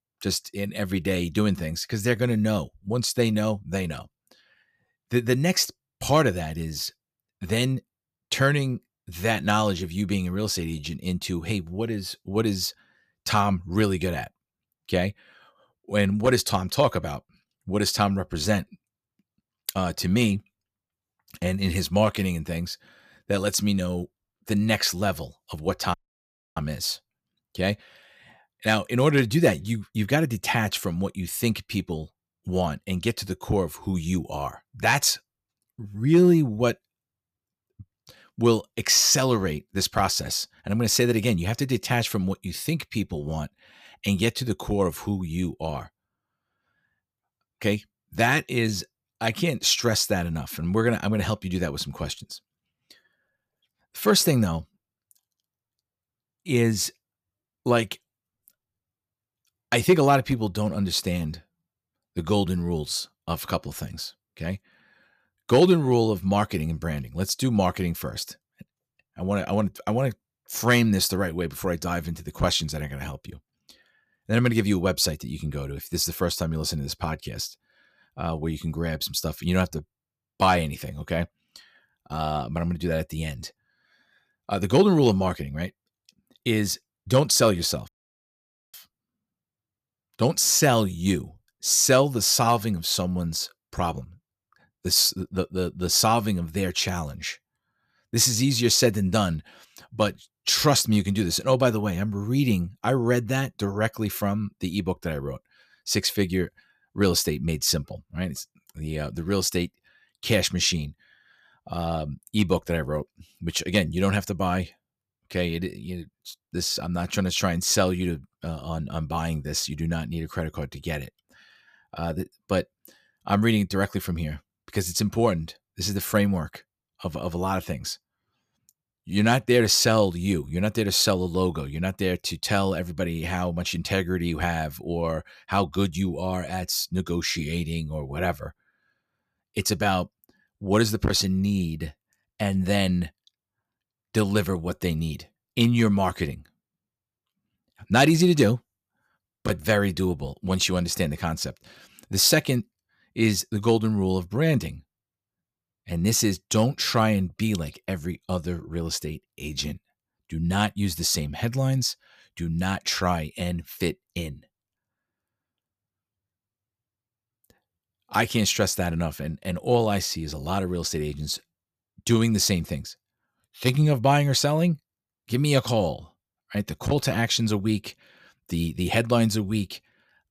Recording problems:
audio cutting out; at 26 s for 0.5 s and at 1:28 for 1 s

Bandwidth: 14.5 kHz